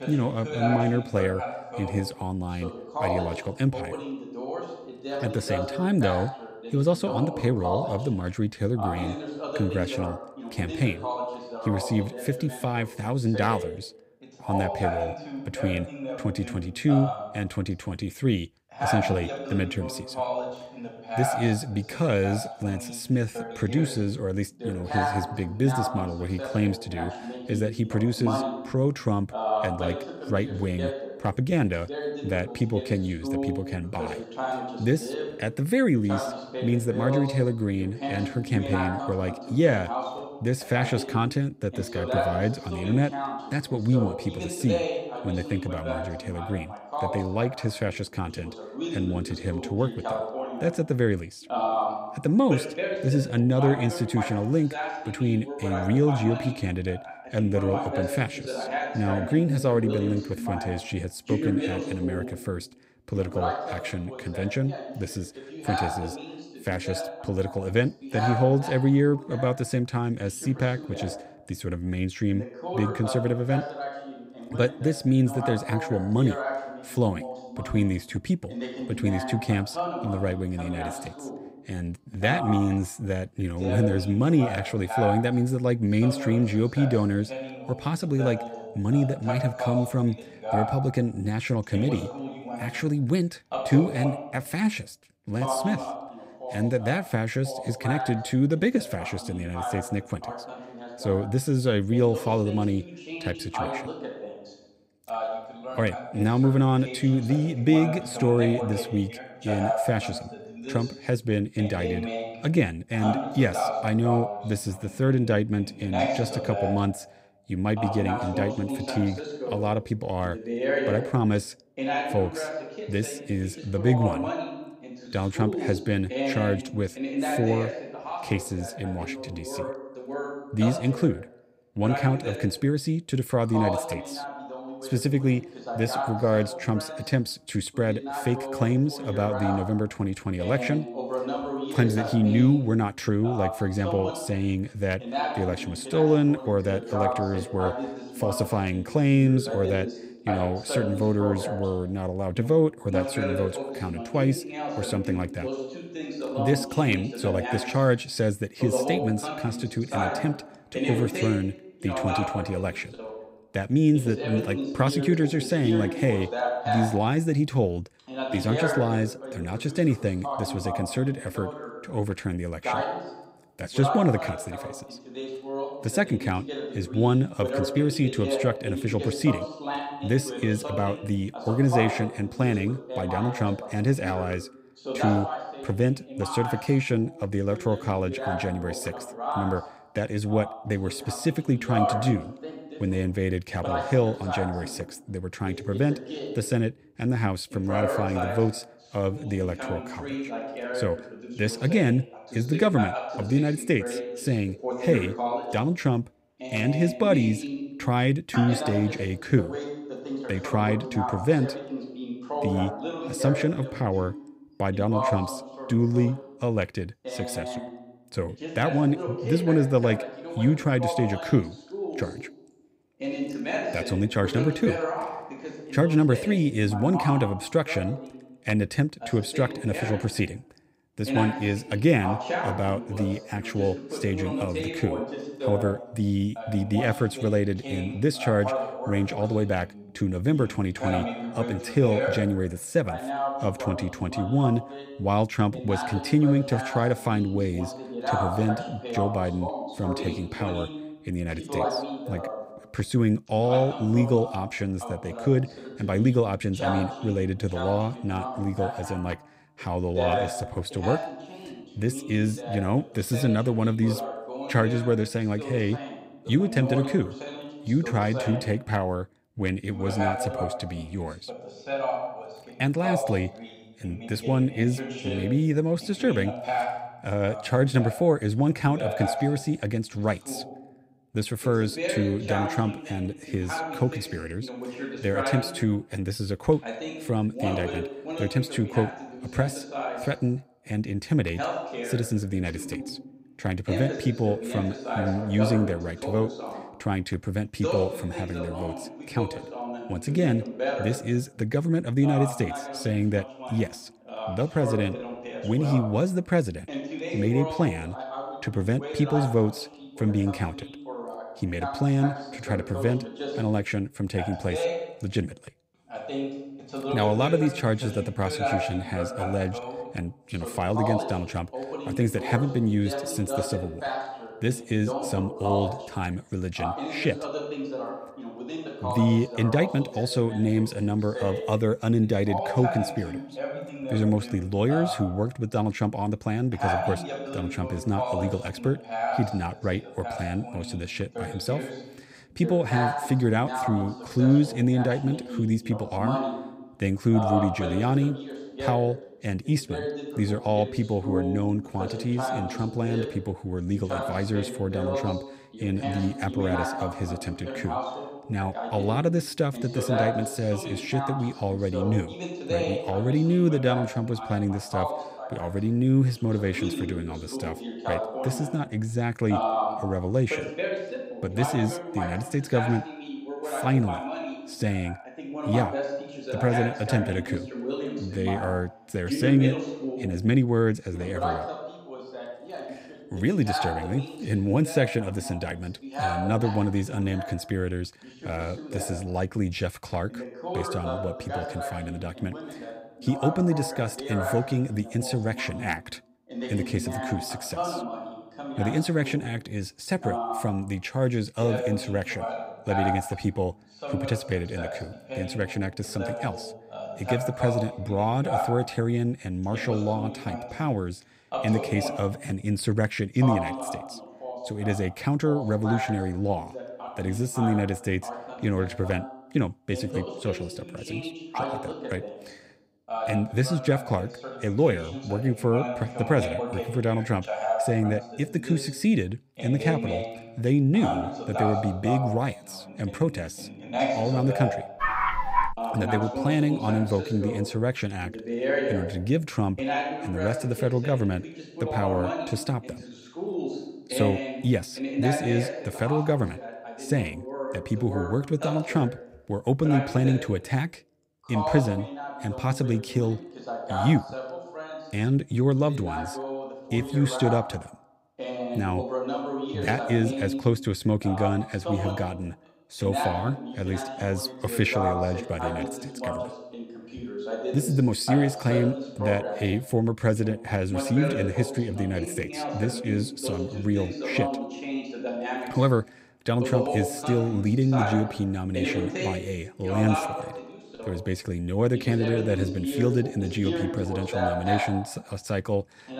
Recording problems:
voice in the background; loud; throughout; 6 dB below the speech
dog barking; loud; at 7:15; peak 3 dB above the speech

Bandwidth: 15.5 kHz